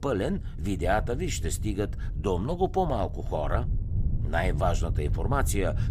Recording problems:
wind noise on the microphone; occasional gusts; 15 dB below the speech

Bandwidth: 15 kHz